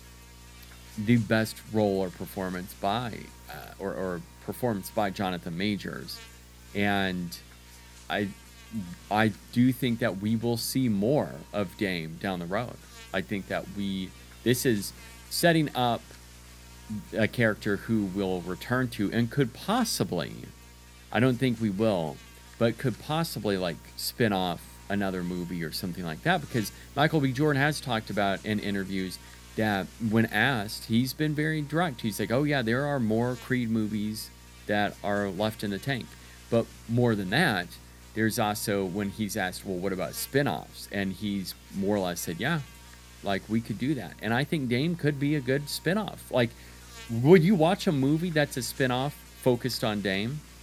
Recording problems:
electrical hum; faint; throughout; 60 Hz, 20 dB below the speech

